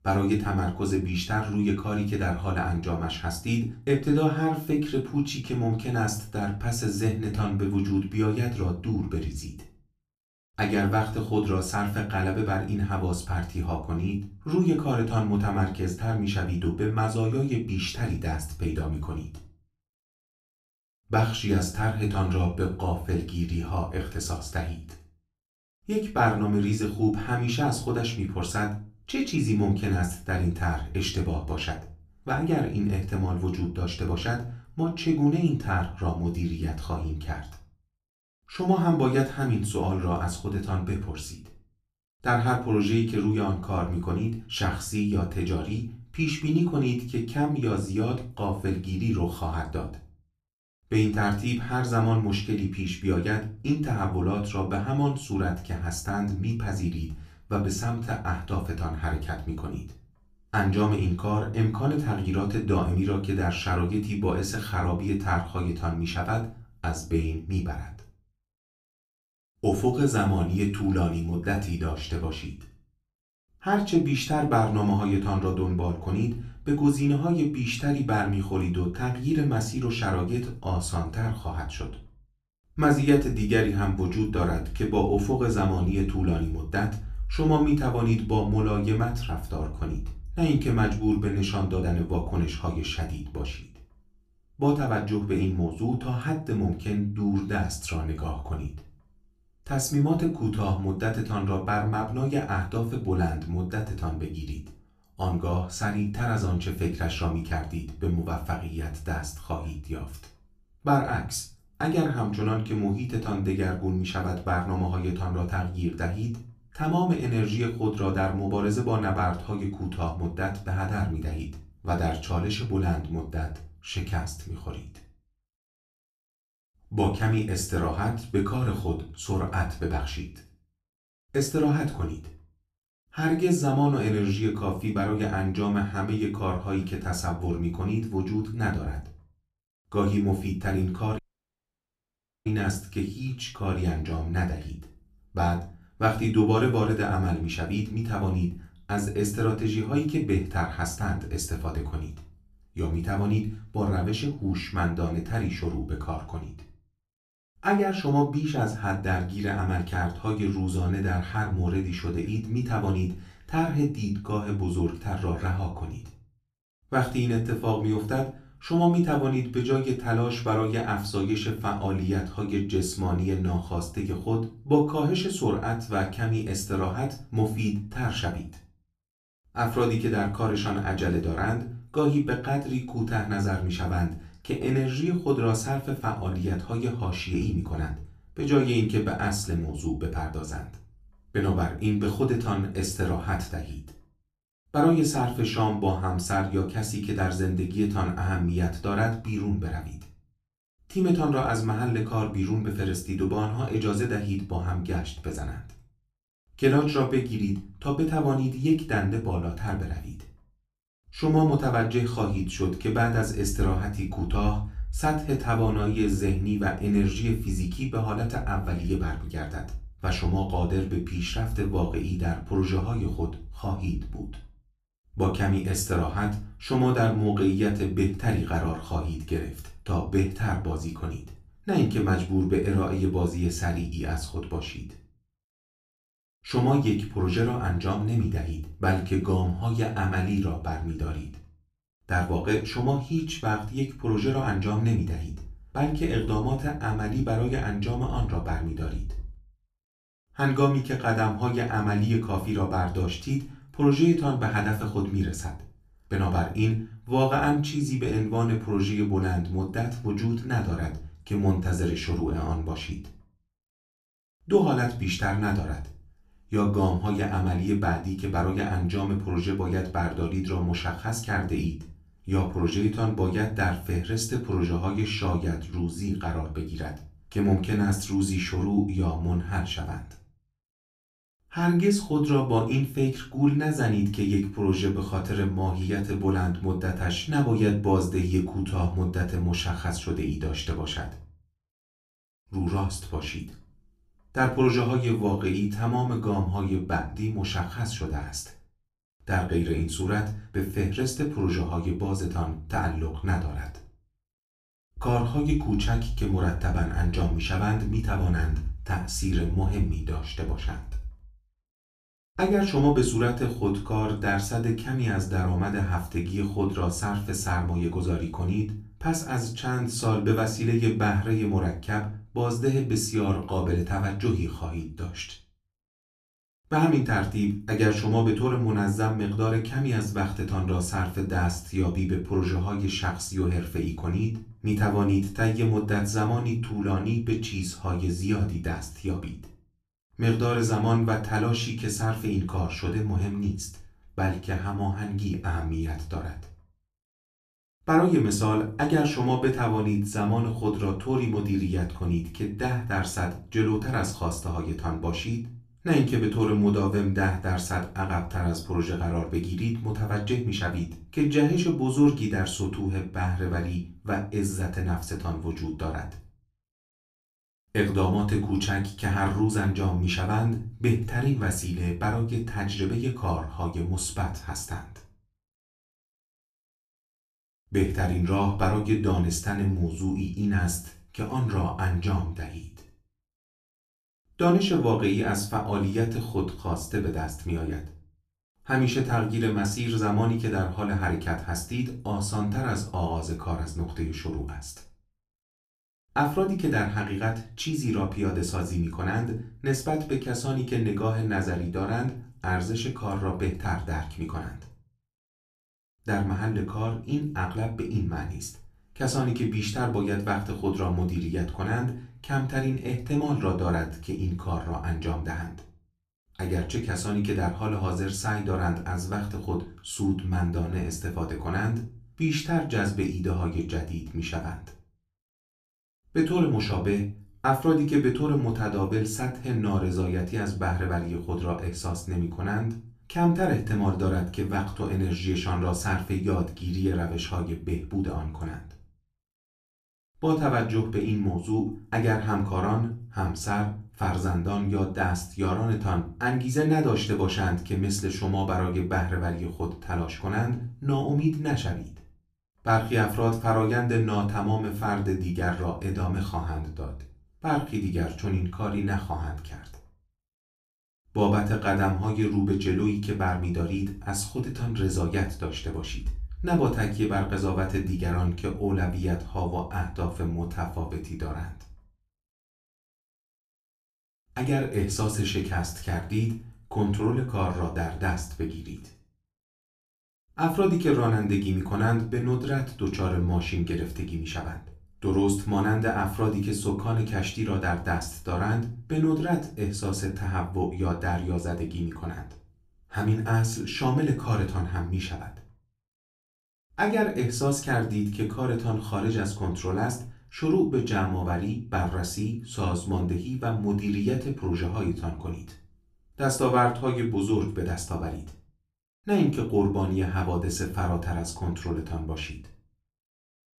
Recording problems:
off-mic speech; far
room echo; very slight; dies away in 0.3 s
audio cutting out; at 2:21 for 1.5 s

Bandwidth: 14.5 kHz